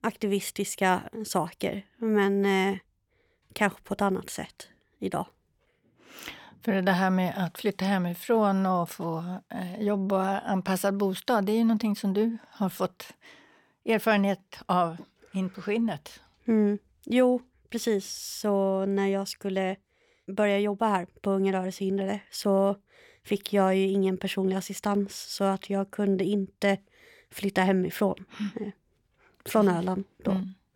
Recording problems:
none

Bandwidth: 17 kHz